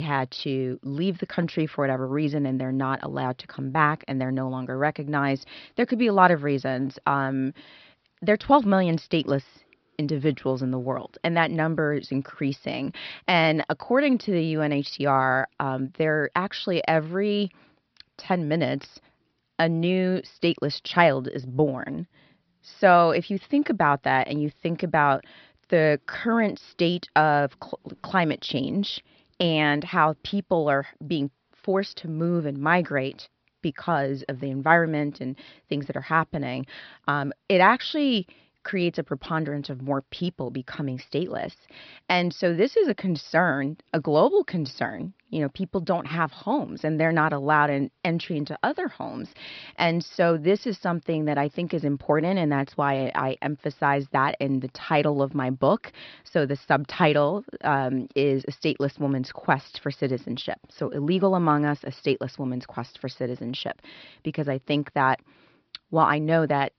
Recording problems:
high frequencies cut off; noticeable; nothing above 5.5 kHz
abrupt cut into speech; at the start

